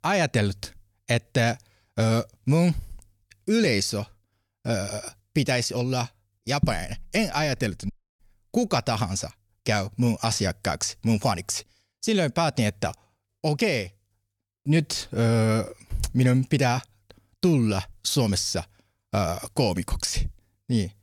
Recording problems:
audio cutting out; at 8 s

